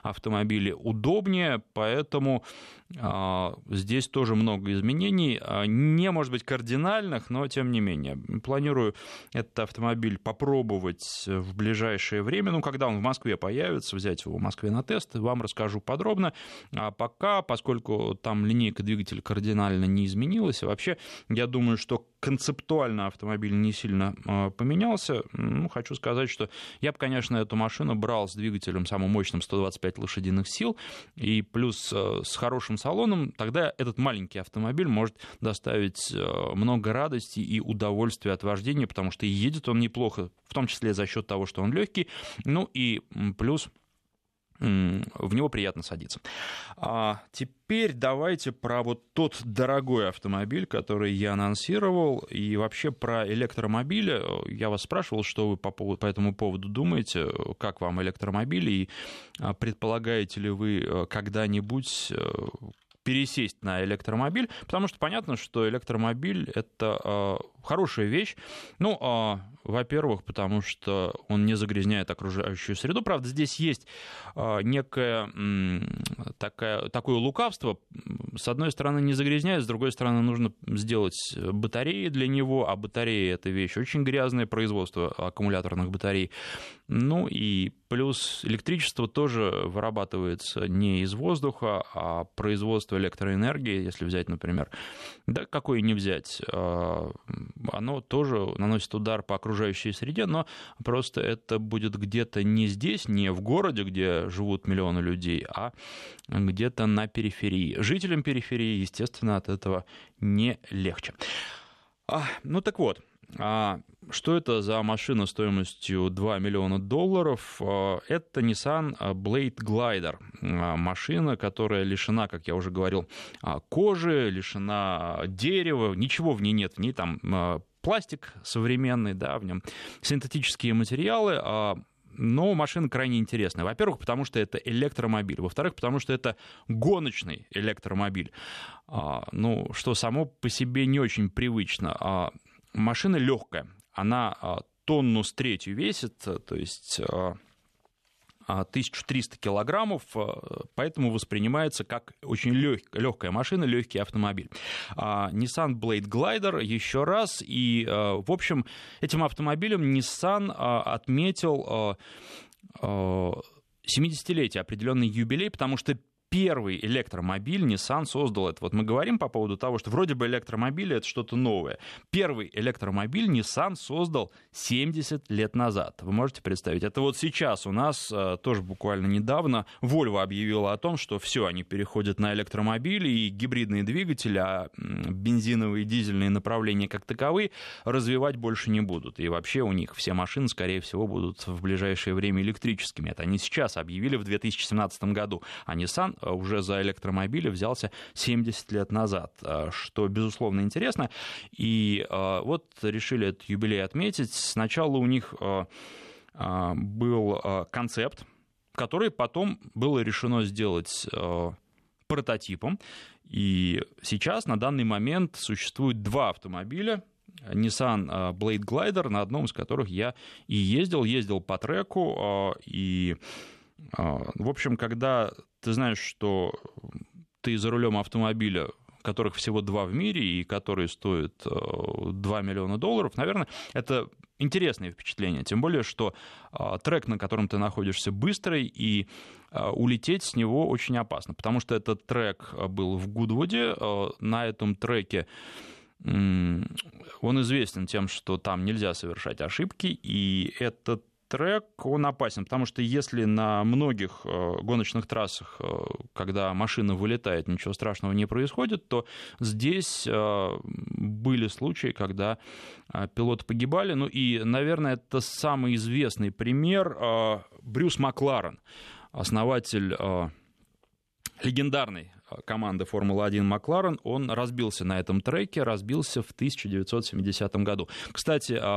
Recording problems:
abrupt cut into speech; at the end

